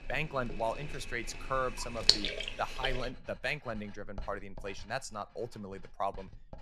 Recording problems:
household noises; very loud; throughout; 5 dB above the speech

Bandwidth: 15 kHz